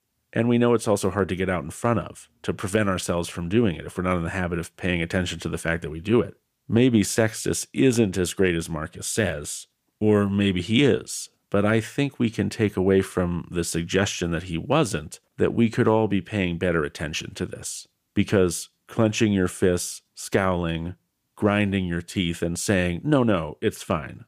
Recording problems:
none

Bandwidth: 15 kHz